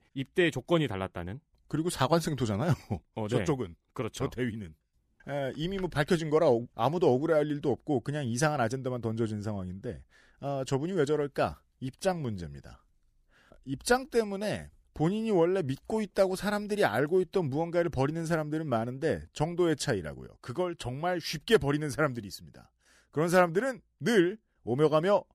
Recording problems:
none

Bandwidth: 15 kHz